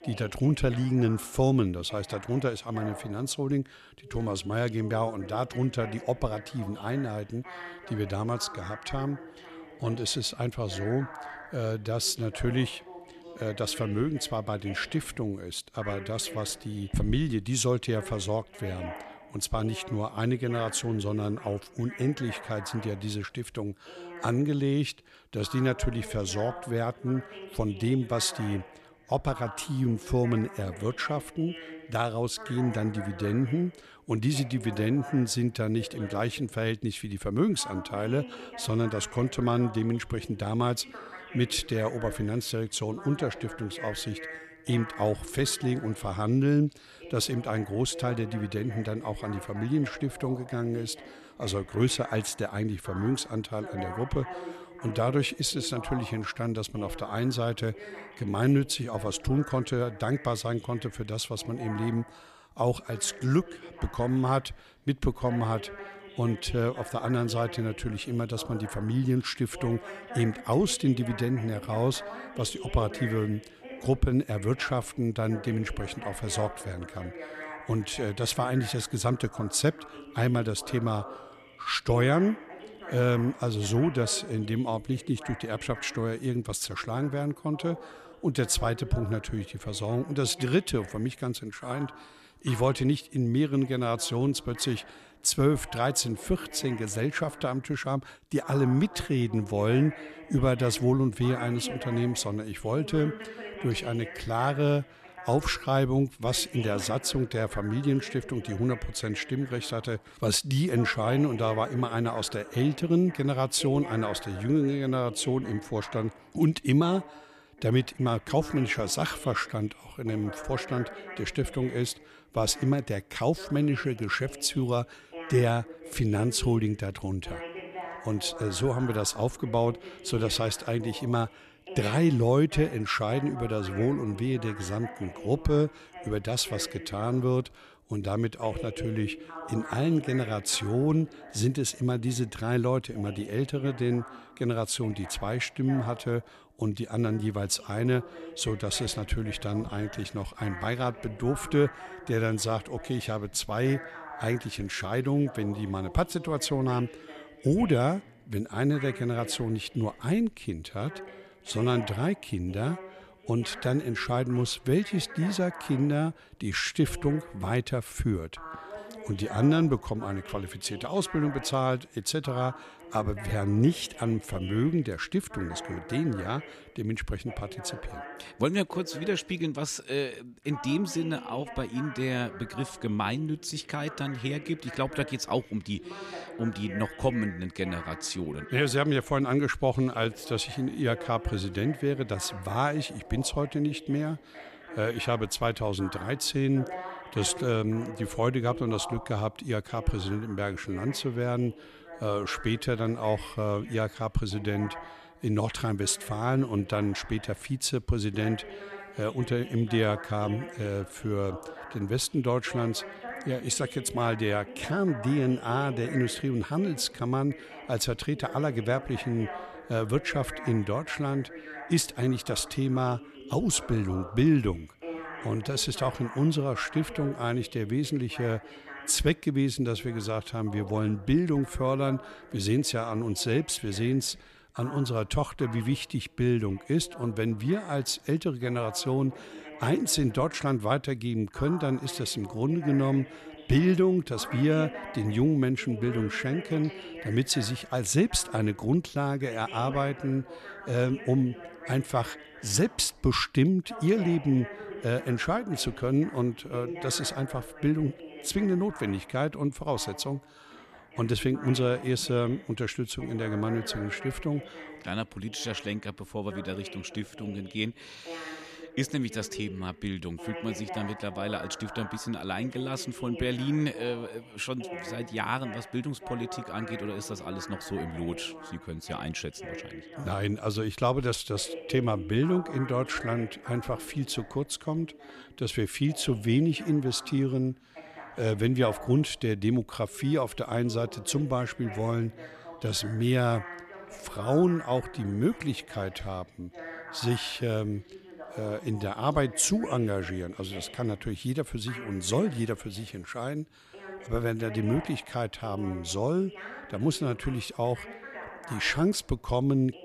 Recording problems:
voice in the background; noticeable; throughout; 15 dB below the speech

